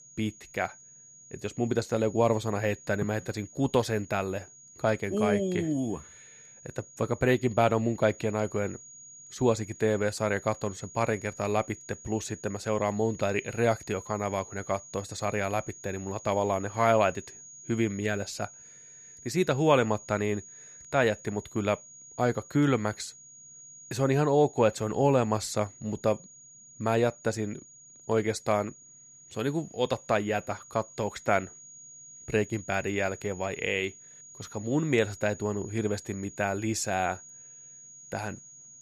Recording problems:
high-pitched whine; noticeable; throughout; 6.5 kHz, 20 dB below the speech

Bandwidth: 14.5 kHz